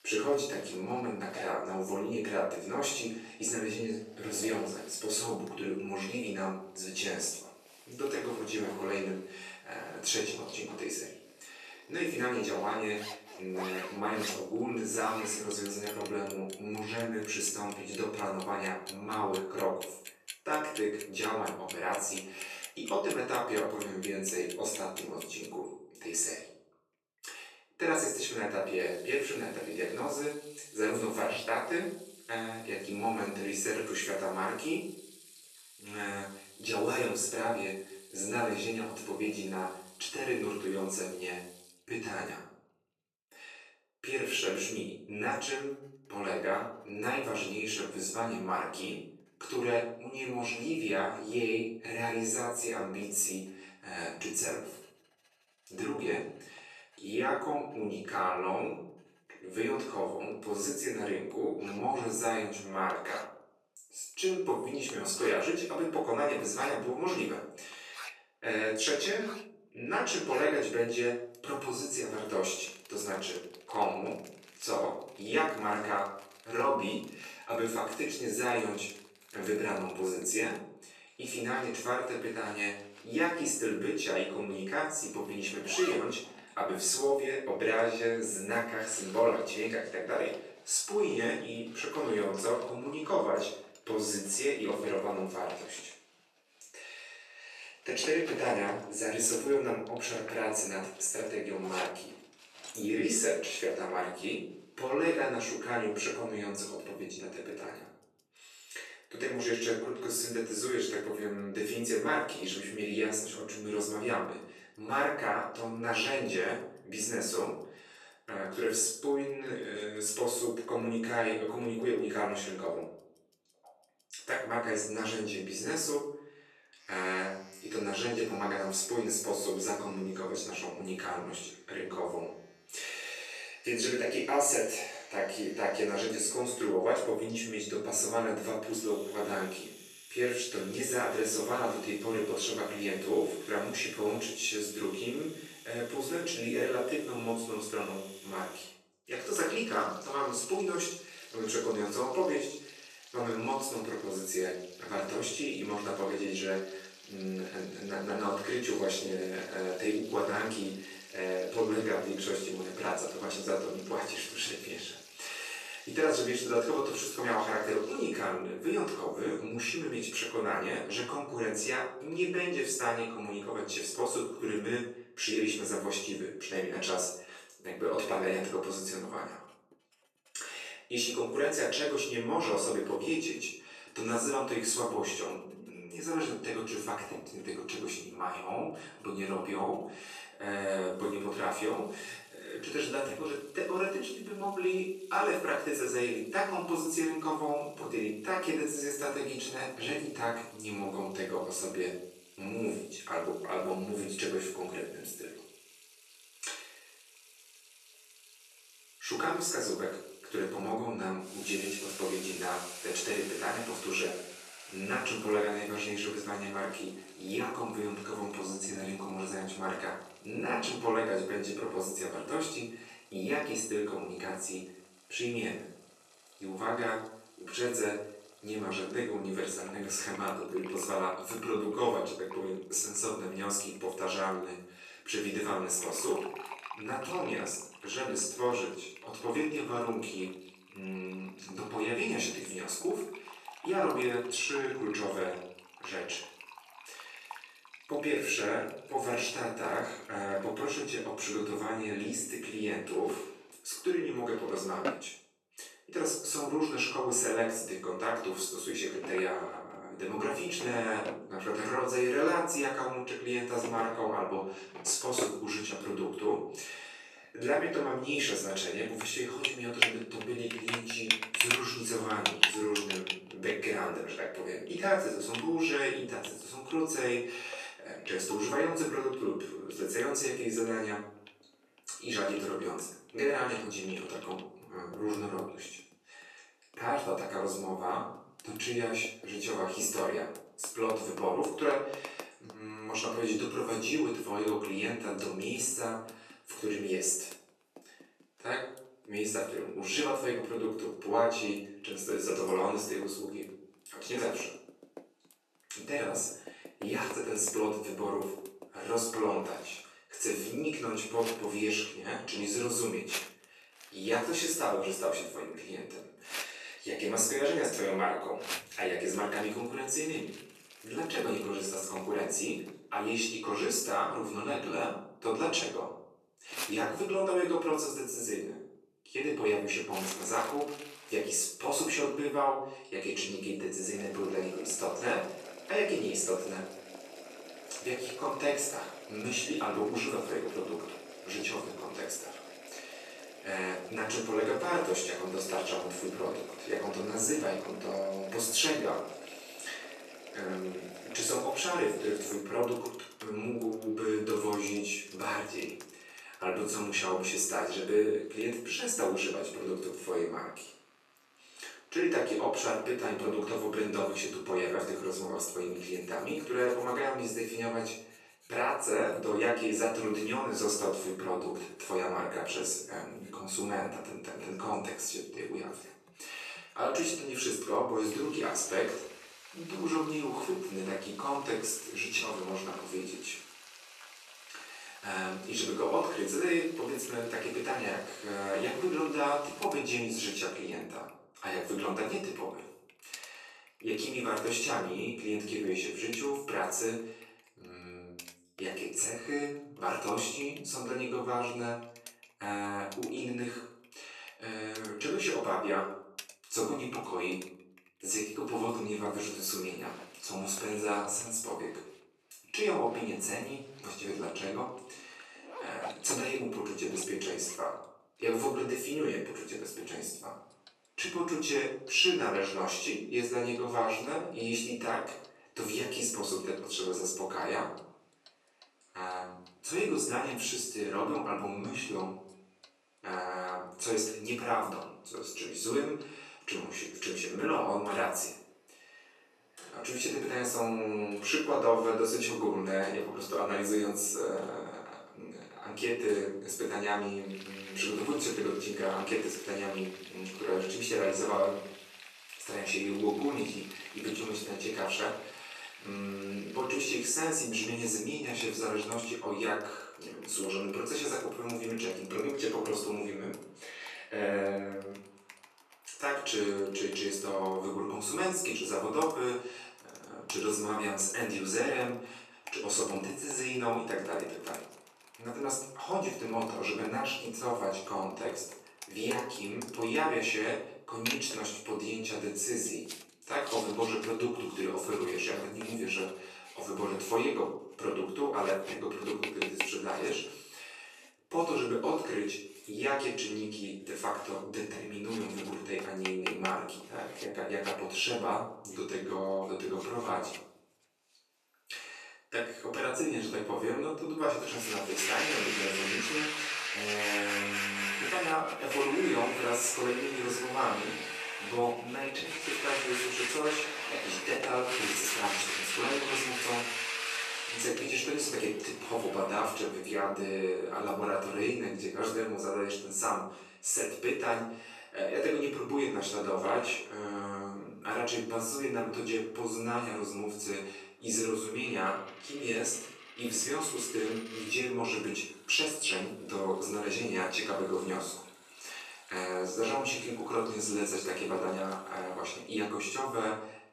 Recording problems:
off-mic speech; far
room echo; noticeable; dies away in 0.6 s
thin; somewhat; fading below 350 Hz
household noises; loud; throughout; 9 dB below the speech

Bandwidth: 13.5 kHz